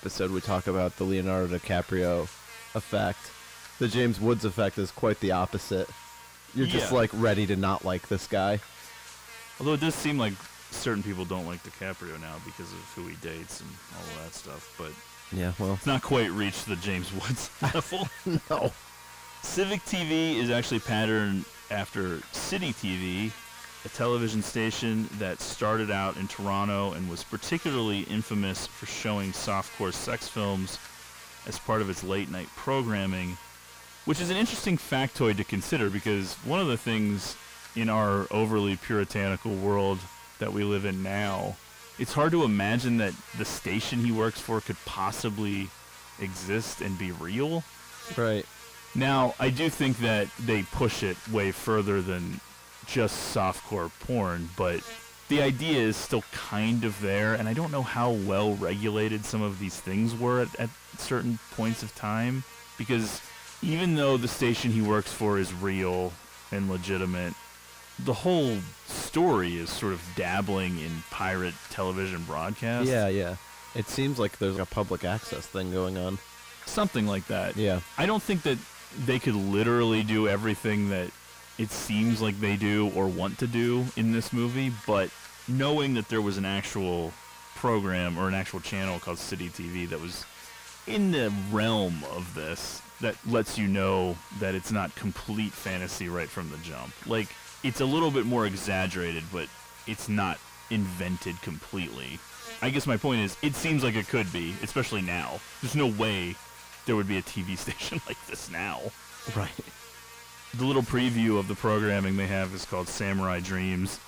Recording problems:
distortion; heavy; 6 dB below the speech
electrical hum; noticeable; throughout; 60 Hz, 15 dB below the speech

